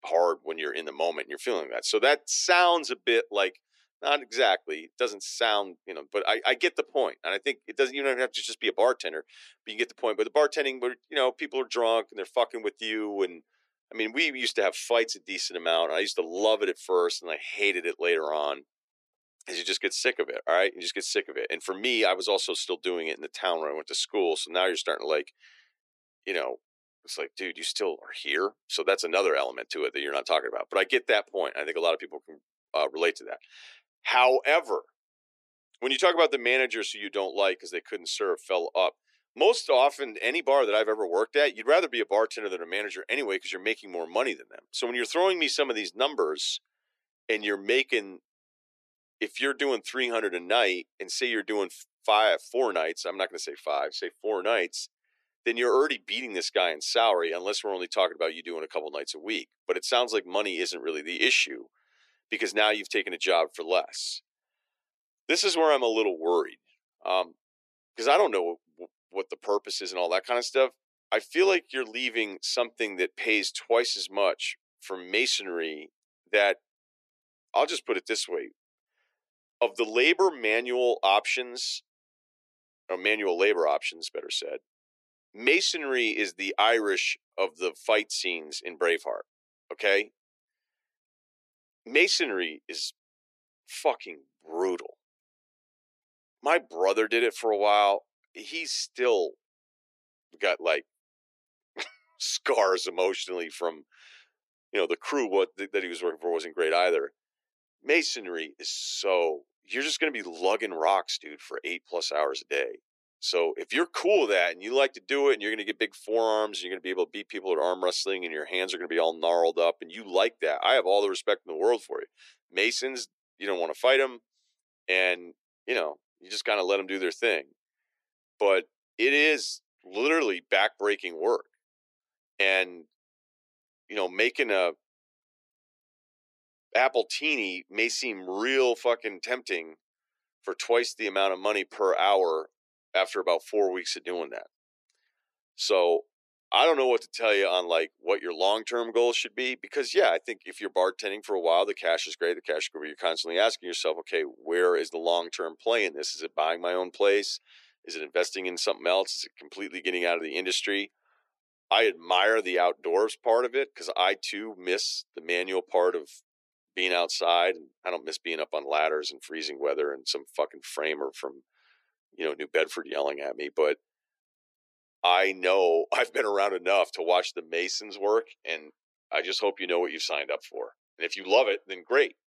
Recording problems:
thin; very; fading below 350 Hz

